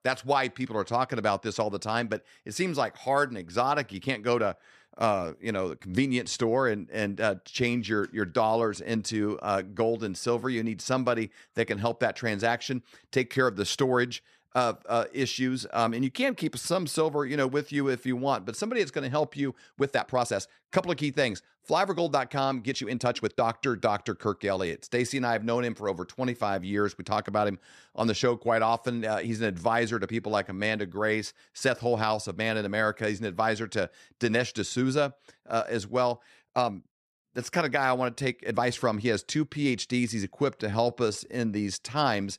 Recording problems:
uneven, jittery; strongly; from 3.5 to 41 s

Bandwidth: 14 kHz